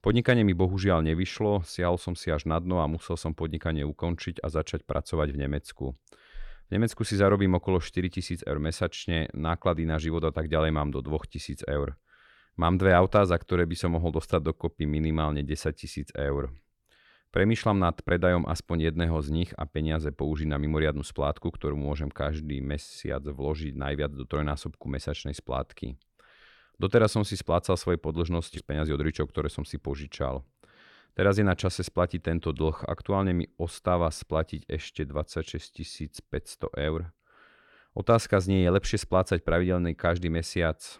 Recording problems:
none

